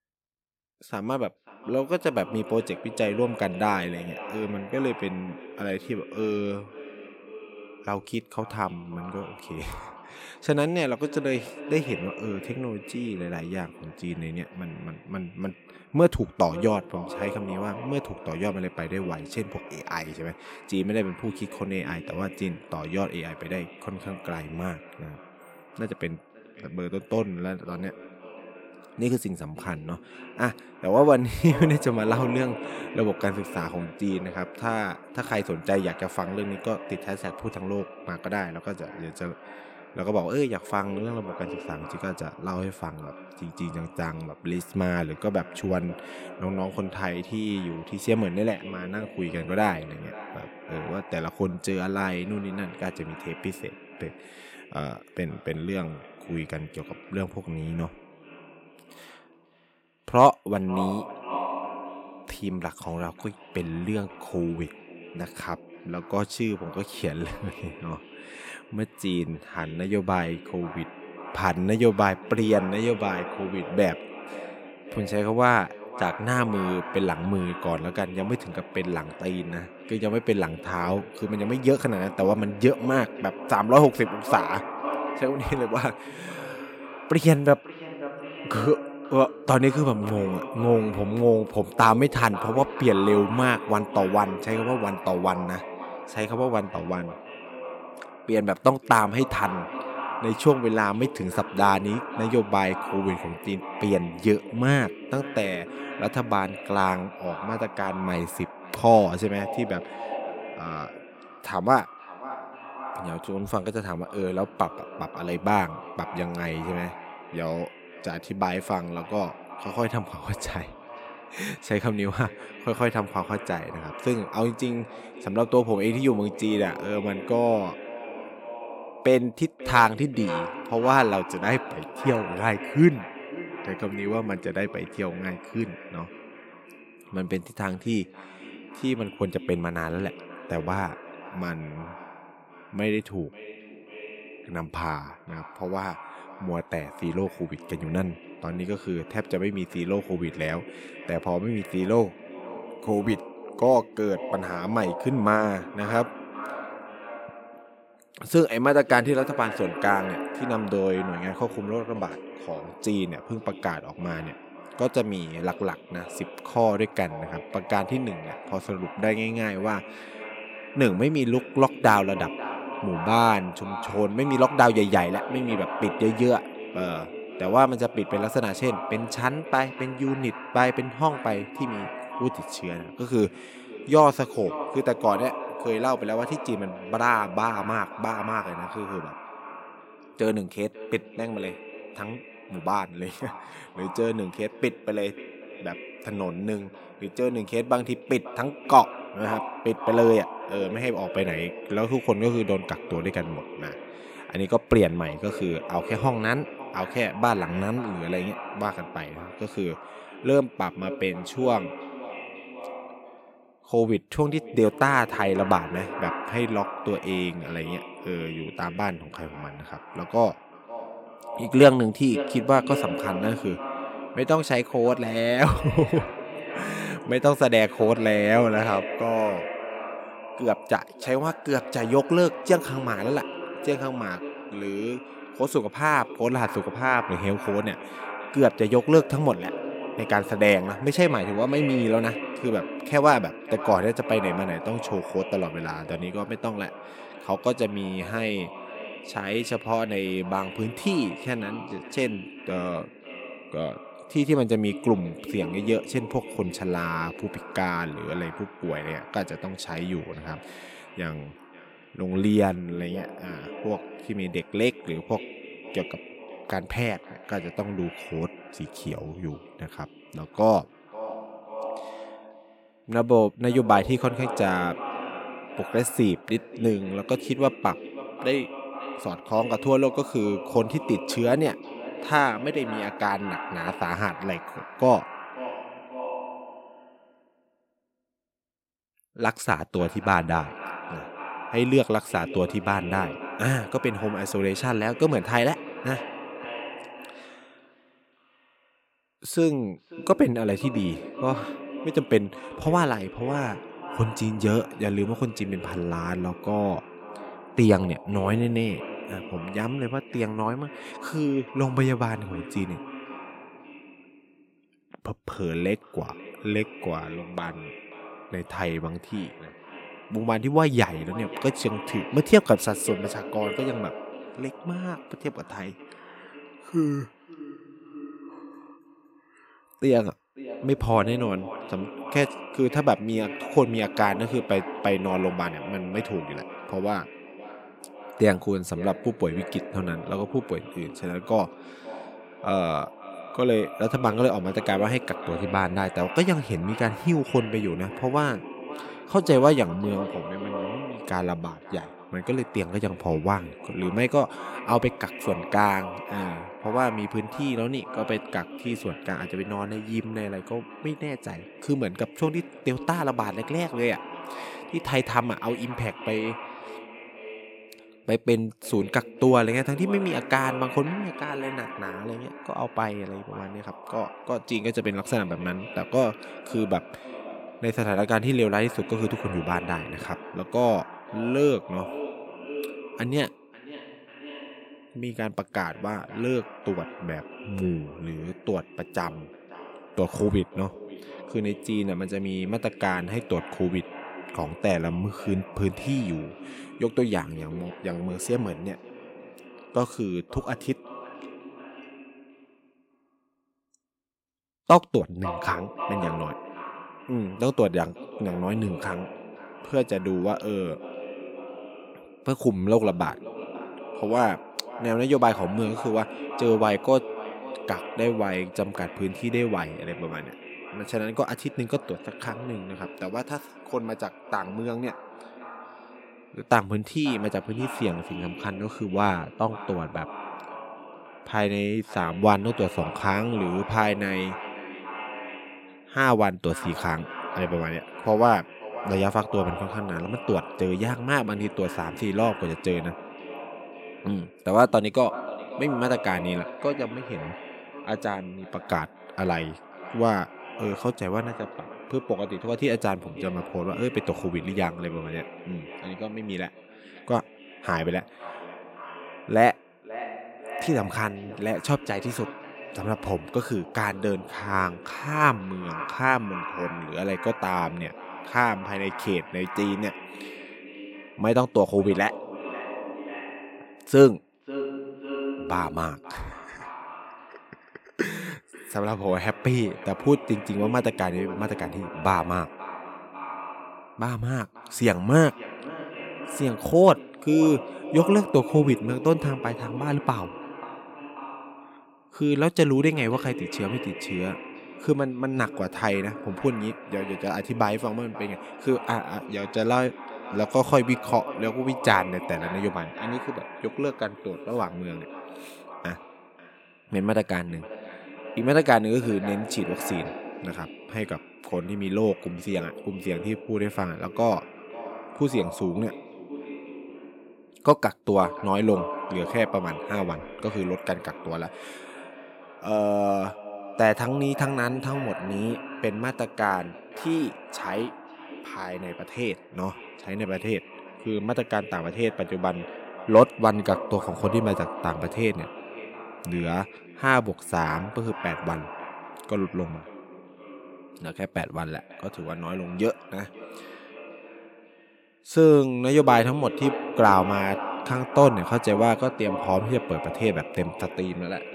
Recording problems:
echo of what is said; noticeable; throughout; 540 ms later, 10 dB below the speech

